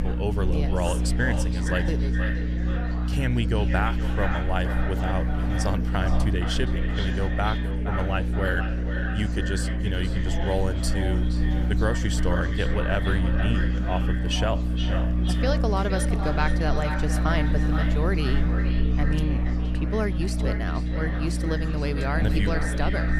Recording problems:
echo of what is said; strong; throughout; 470 ms later, 7 dB below the speech
electrical hum; loud; throughout; 60 Hz, 8 dB below the speech
chatter from many people; noticeable; throughout; 10 dB below the speech

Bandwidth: 14.5 kHz